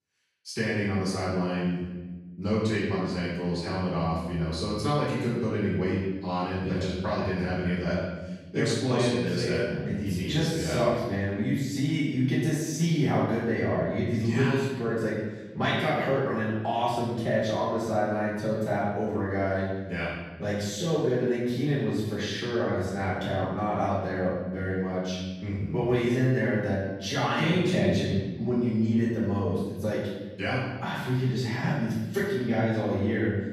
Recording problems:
room echo; strong; dies away in 1.1 s
off-mic speech; far

